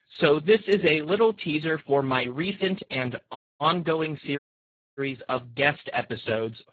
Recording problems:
garbled, watery; badly; nothing above 4 kHz
audio cutting out; at 3.5 s and at 4.5 s for 0.5 s

